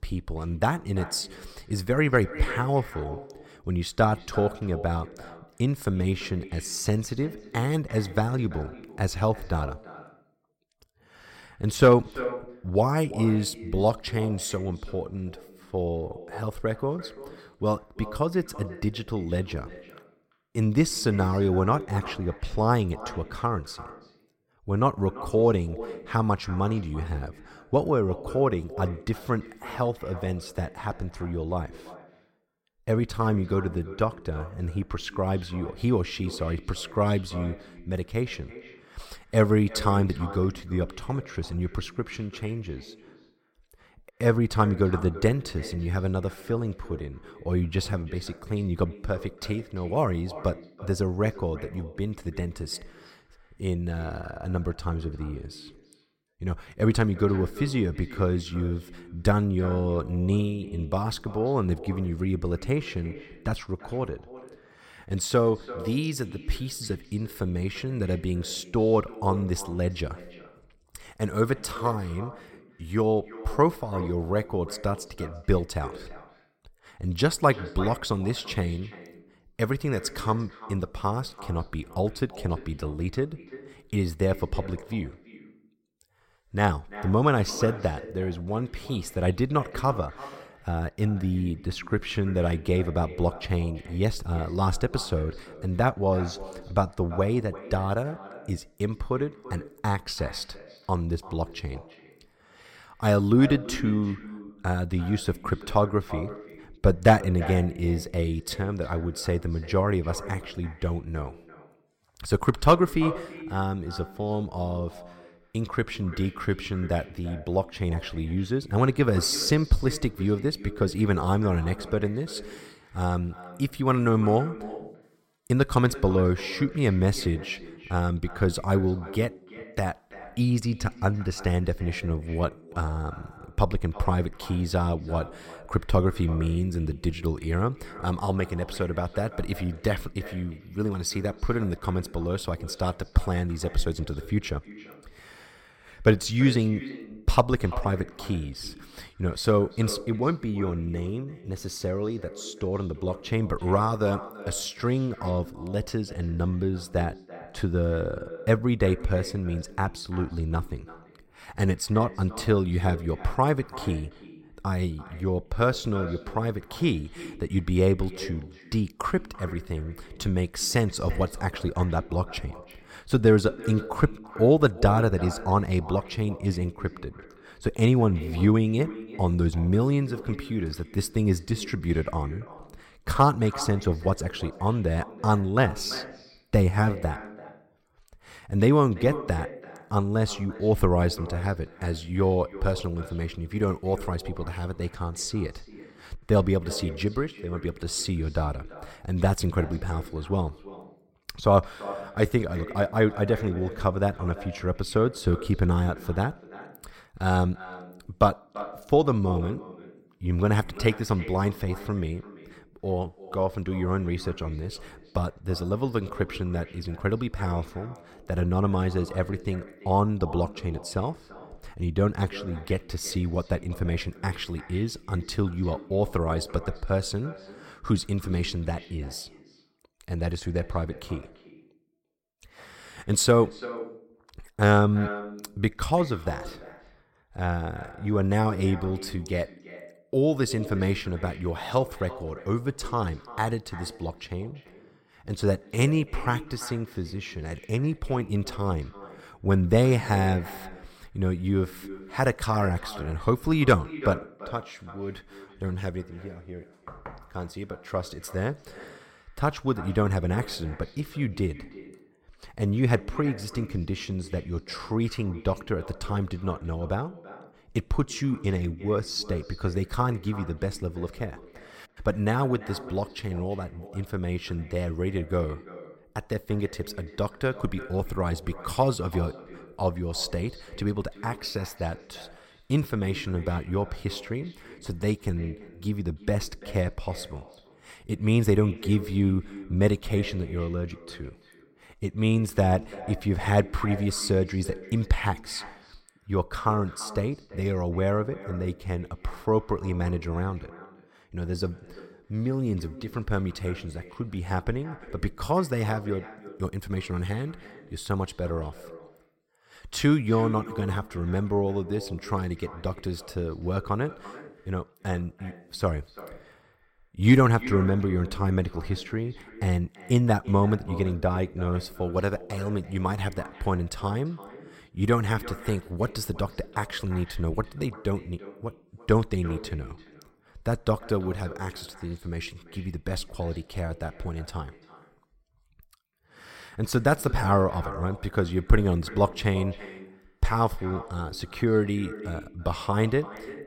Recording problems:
echo of what is said; noticeable; throughout; 340 ms later, 15 dB below the speech

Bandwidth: 16.5 kHz